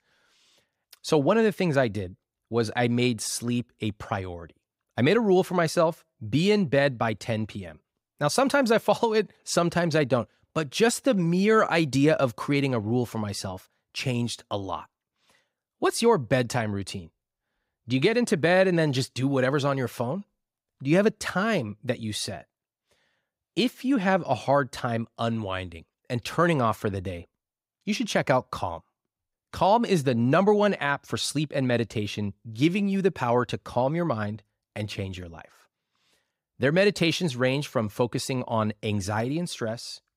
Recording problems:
none

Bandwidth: 15.5 kHz